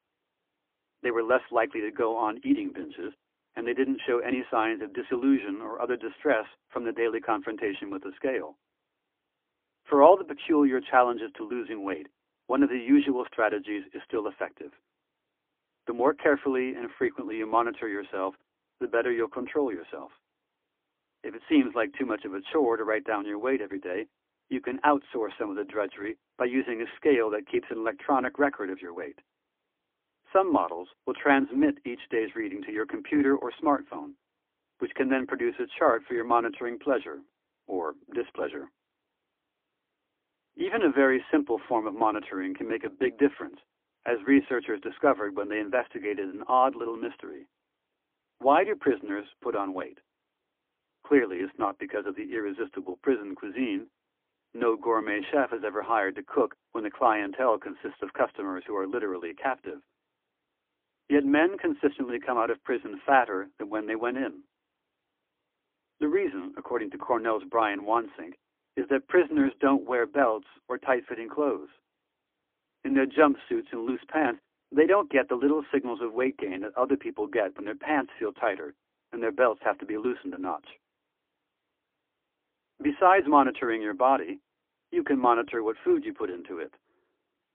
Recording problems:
phone-call audio; poor line; nothing above 3.5 kHz

